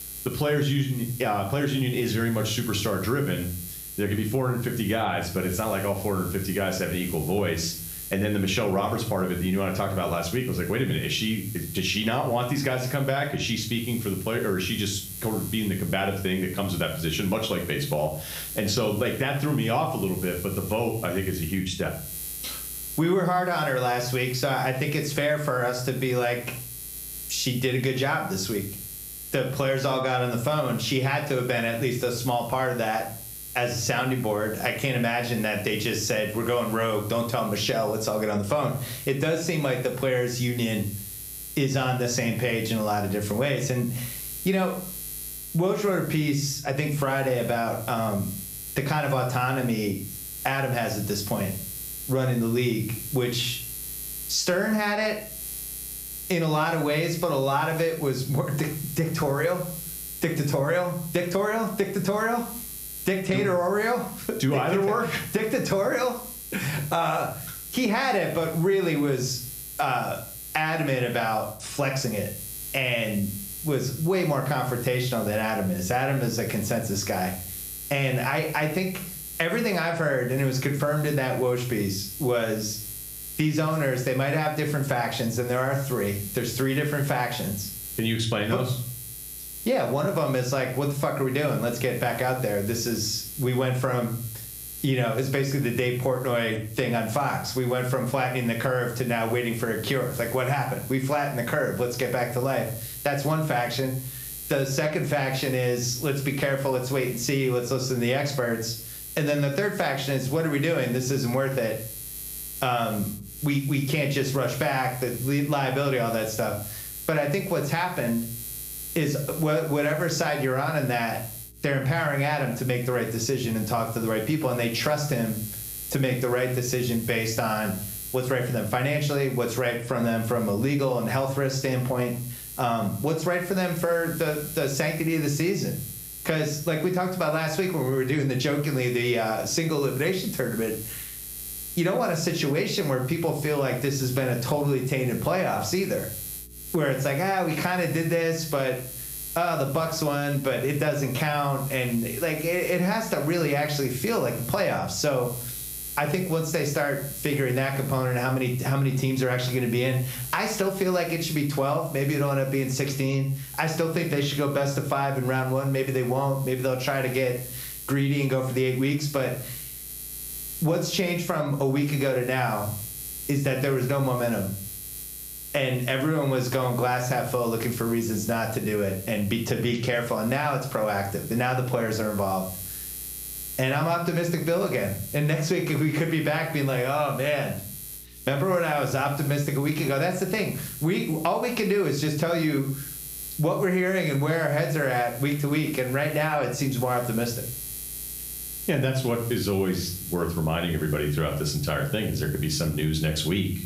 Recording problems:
room echo; slight; dies away in 0.4 s
off-mic speech; somewhat distant
squashed, flat; somewhat
electrical hum; noticeable; throughout; 60 Hz, 15 dB below the speech

